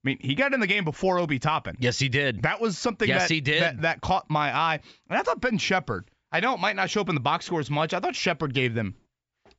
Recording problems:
high frequencies cut off; noticeable; nothing above 8 kHz

